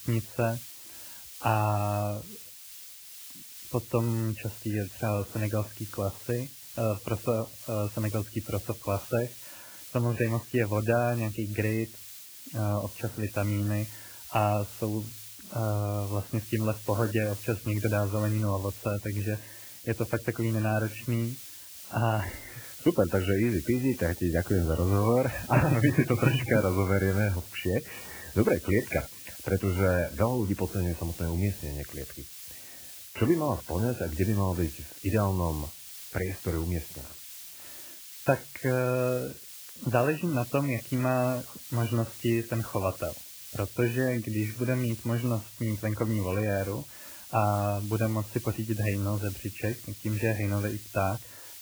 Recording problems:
garbled, watery; badly; nothing above 3 kHz
hiss; noticeable; throughout; 10 dB below the speech

